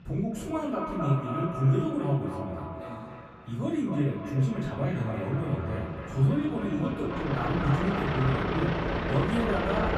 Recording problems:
echo of what is said; strong; throughout; 260 ms later, 8 dB below the speech
off-mic speech; far
room echo; noticeable; dies away in 0.4 s
traffic noise; loud; throughout; 4 dB below the speech

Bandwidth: 14 kHz